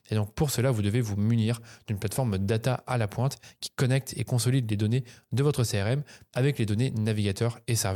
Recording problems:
abrupt cut into speech; at the end

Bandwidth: 18.5 kHz